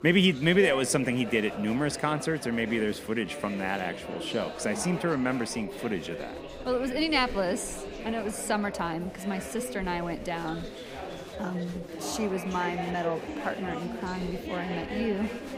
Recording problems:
chatter from many people; loud; throughout; 8 dB below the speech

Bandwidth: 15.5 kHz